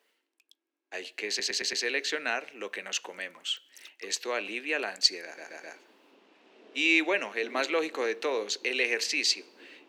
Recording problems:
thin; somewhat; fading below 300 Hz
rain or running water; faint; throughout; 25 dB below the speech
audio stuttering; at 1.5 s and at 5.5 s

